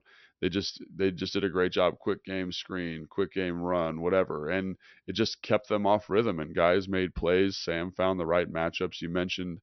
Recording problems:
high frequencies cut off; noticeable; nothing above 6 kHz

